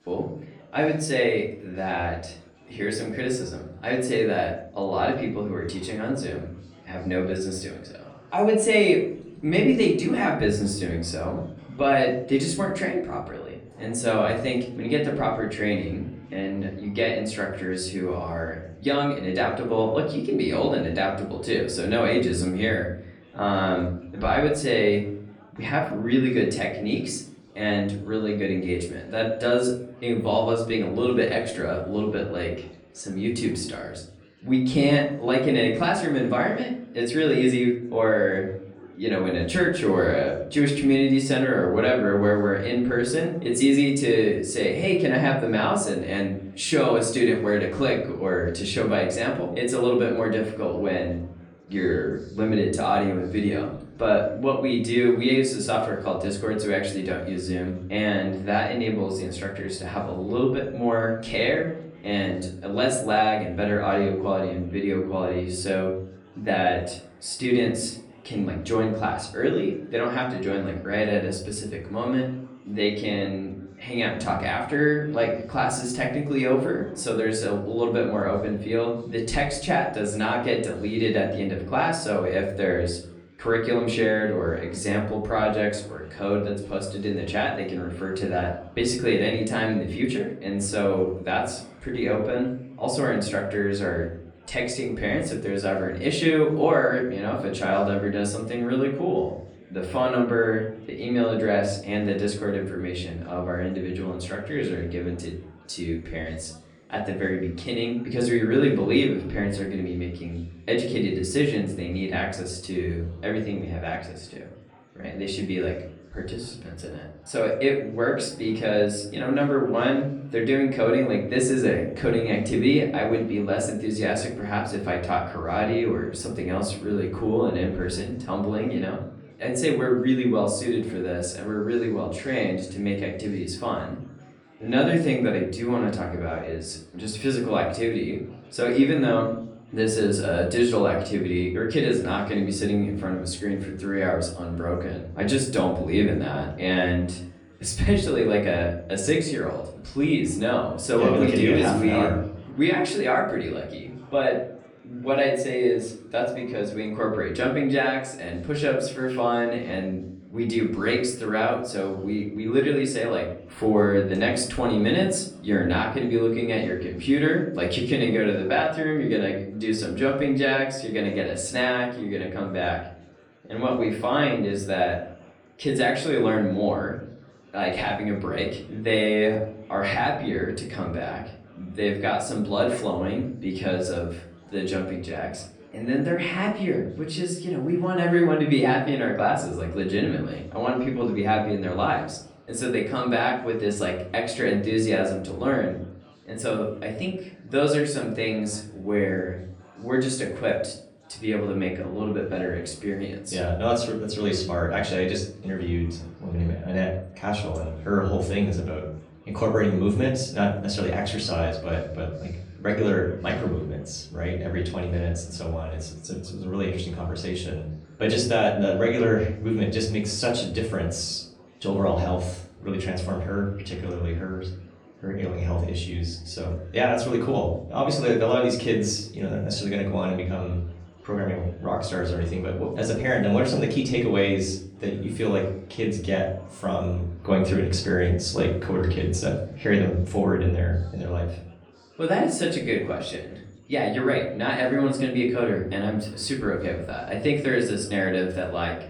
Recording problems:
off-mic speech; far
room echo; slight; dies away in 0.6 s
chatter from many people; faint; throughout; 30 dB below the speech

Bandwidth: 16.5 kHz